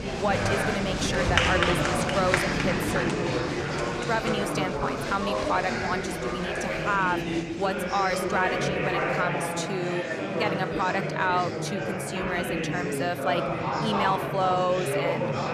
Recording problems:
chatter from many people; very loud; throughout; 2 dB above the speech

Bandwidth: 14 kHz